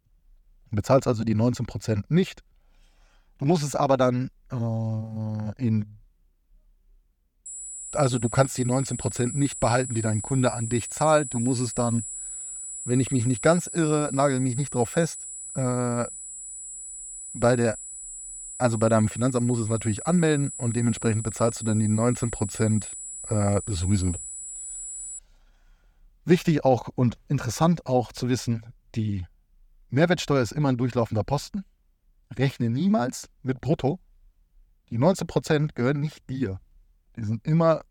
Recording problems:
high-pitched whine; loud; from 7.5 to 25 s; 7.5 kHz, 9 dB below the speech

